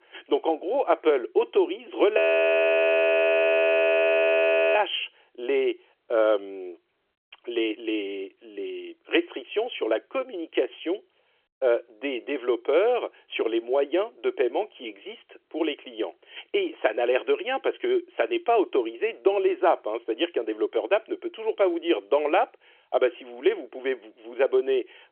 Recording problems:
phone-call audio
audio freezing; at 2 s for 2.5 s

